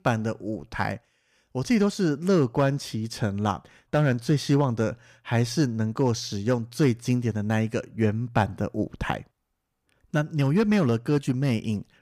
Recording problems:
none

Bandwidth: 15 kHz